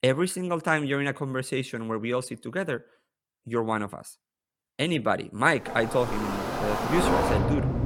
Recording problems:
rain or running water; very faint; from 6 s on; as loud as the speech

